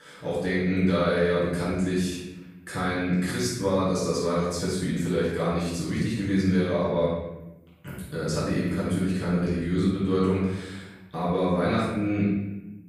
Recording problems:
room echo; strong; dies away in 0.9 s
off-mic speech; far

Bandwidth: 15 kHz